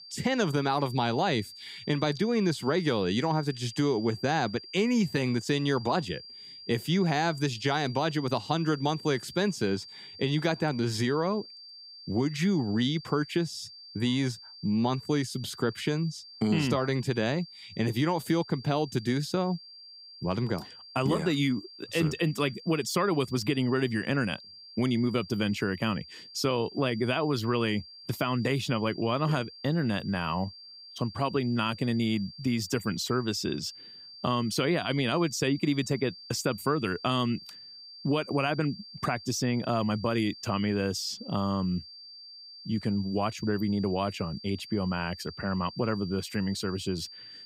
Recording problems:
high-pitched whine; noticeable; throughout; 4.5 kHz, 15 dB below the speech

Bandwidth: 15.5 kHz